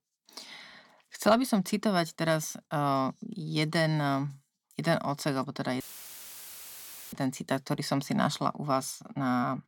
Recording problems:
audio cutting out; filled with static; at 6 s for 1.5 s

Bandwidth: 17 kHz